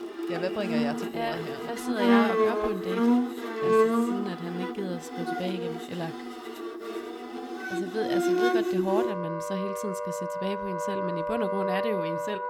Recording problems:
background music; very loud; throughout; 5 dB above the speech

